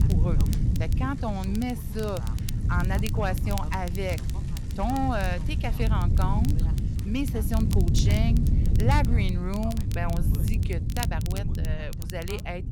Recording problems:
wind noise on the microphone; heavy; 8 dB below the speech
traffic noise; noticeable; throughout; 20 dB below the speech
voice in the background; noticeable; throughout; 20 dB below the speech
crackle, like an old record; noticeable; 10 dB below the speech

